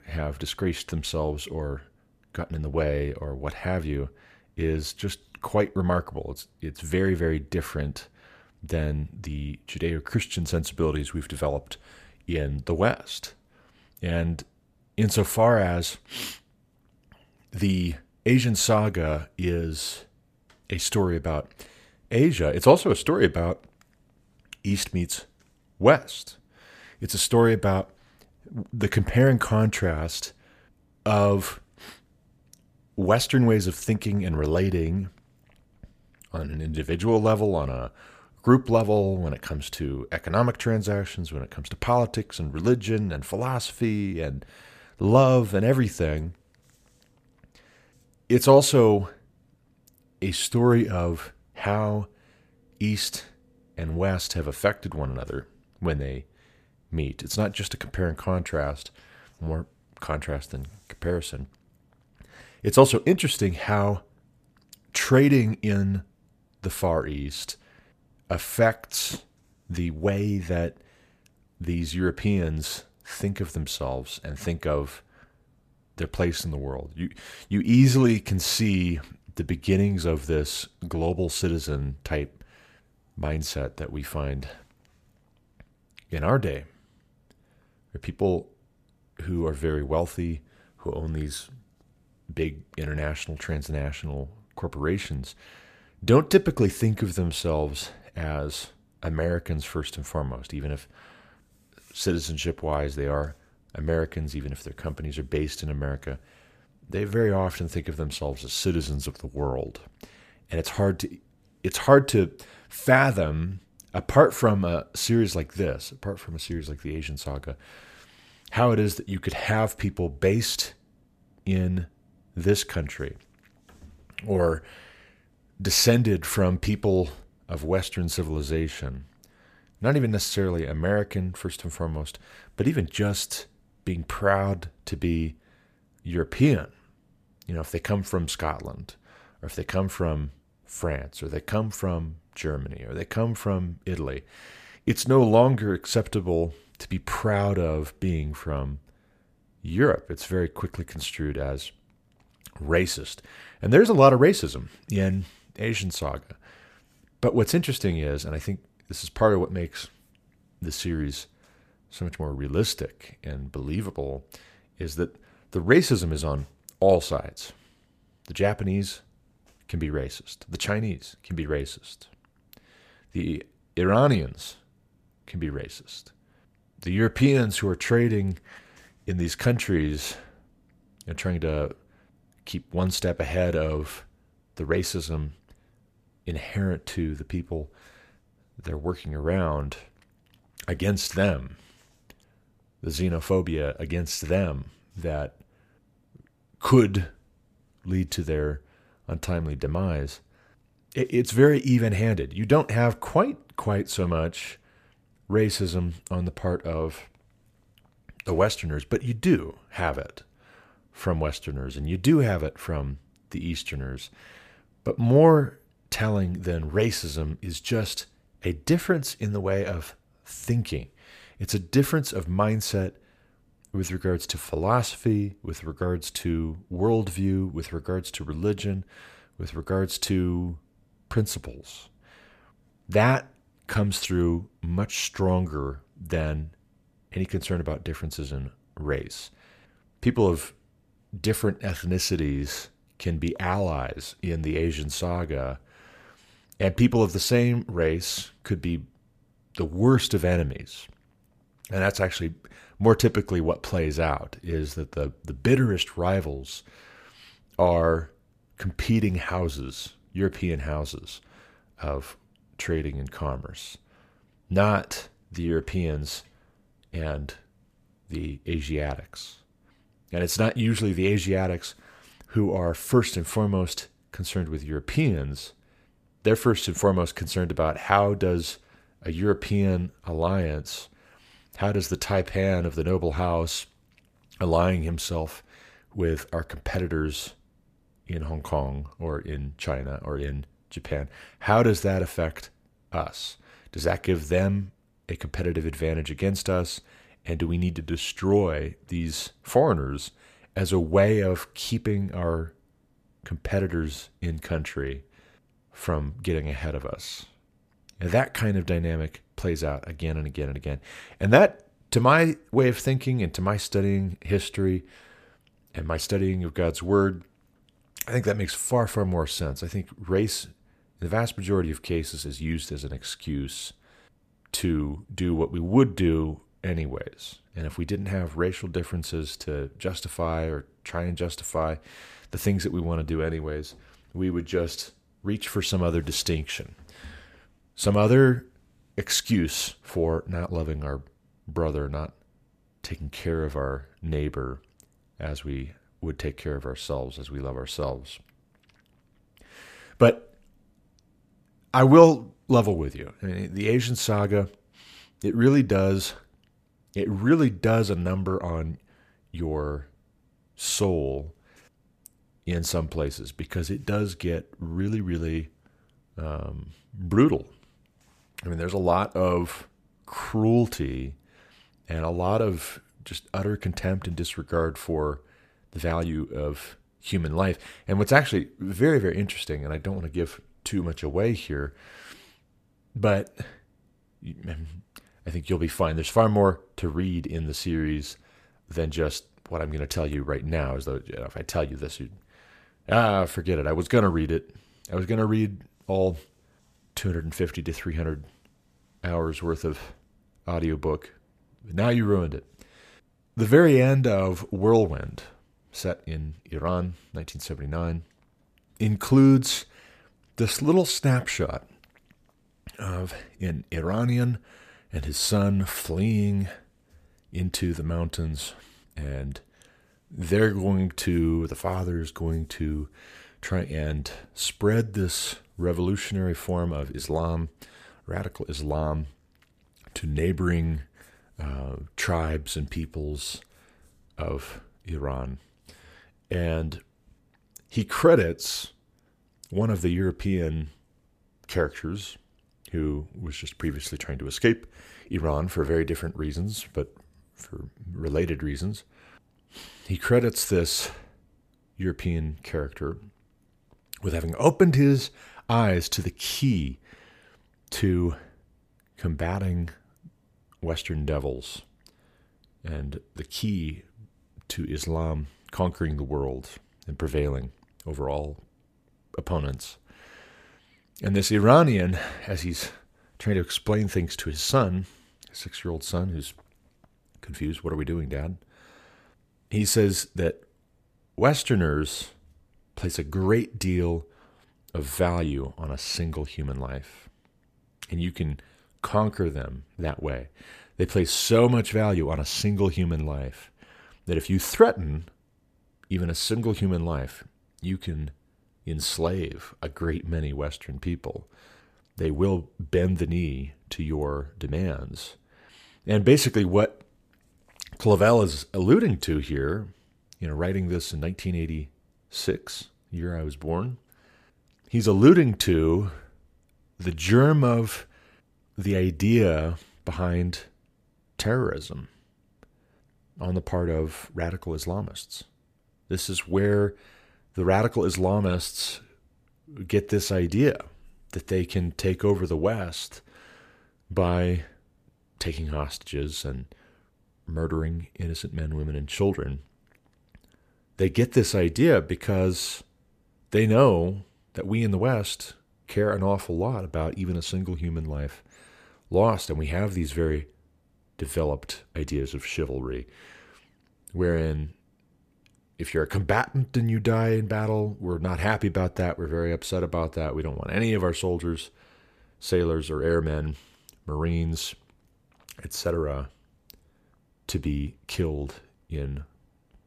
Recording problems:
none

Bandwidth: 14.5 kHz